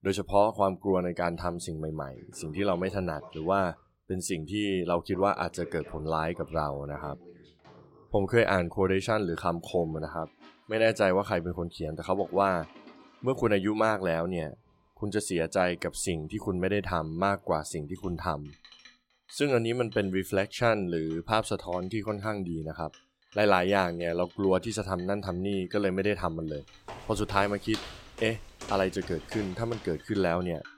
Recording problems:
household noises; faint; throughout; 25 dB below the speech
footsteps; noticeable; from 27 to 30 s; peak 10 dB below the speech

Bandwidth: 16 kHz